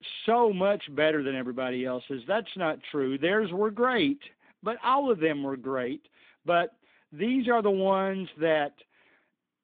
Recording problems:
phone-call audio; nothing above 3.5 kHz

